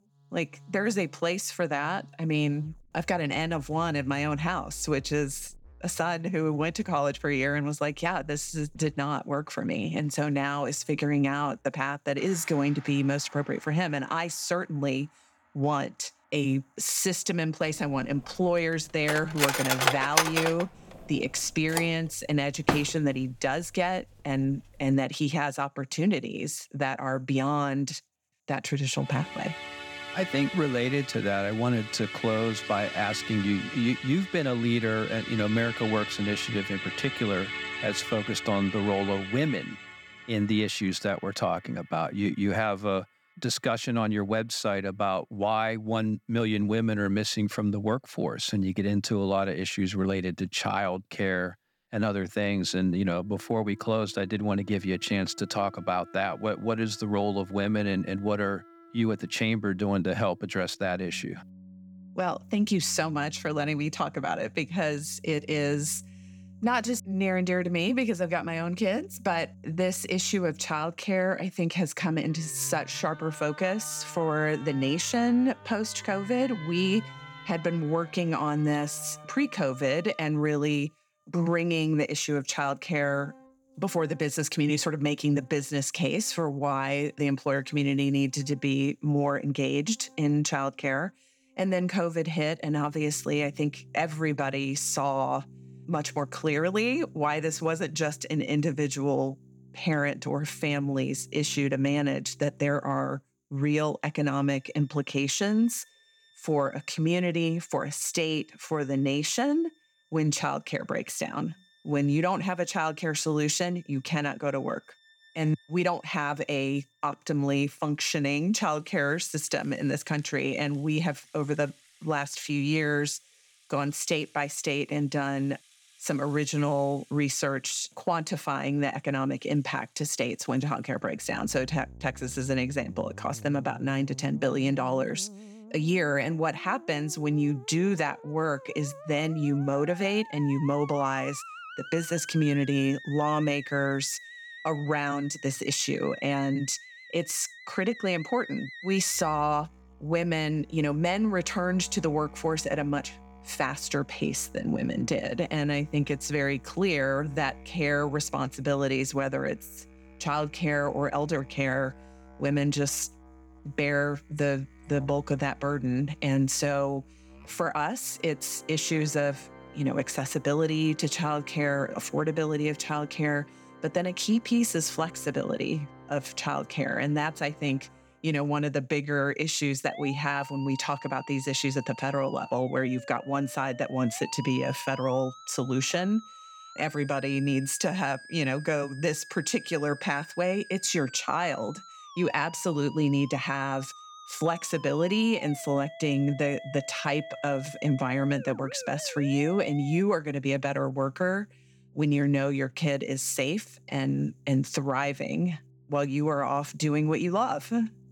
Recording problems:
background music; noticeable; throughout; 15 dB below the speech
clattering dishes; loud; from 19 to 23 s; peak 6 dB above the speech

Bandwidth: 18.5 kHz